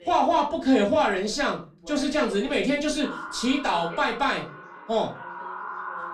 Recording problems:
off-mic speech; far
echo of what is said; noticeable; from 3 s on; 480 ms later, 15 dB below the speech
room echo; very slight; dies away in 0.3 s
voice in the background; faint; throughout; 20 dB below the speech

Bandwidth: 15 kHz